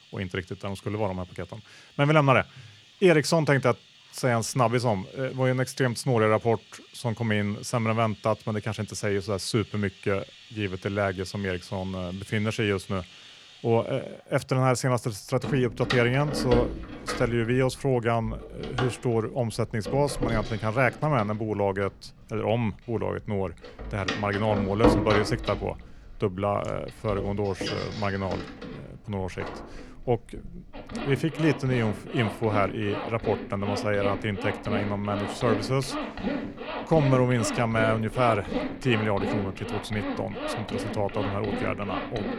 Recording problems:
household noises; loud; throughout; 6 dB below the speech

